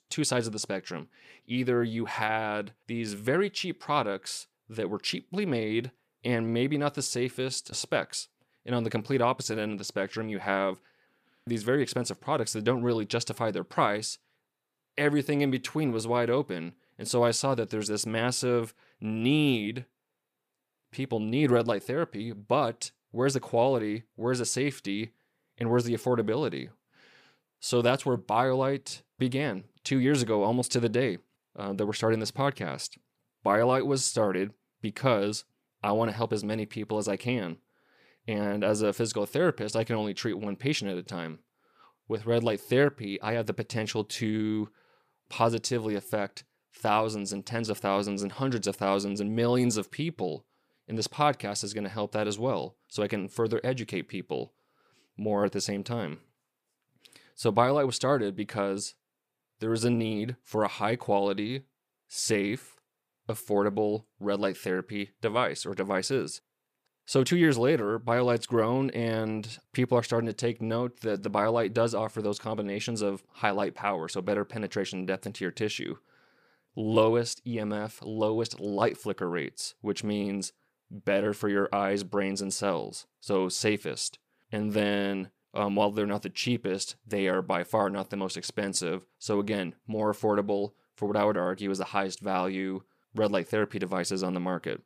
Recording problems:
none

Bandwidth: 15 kHz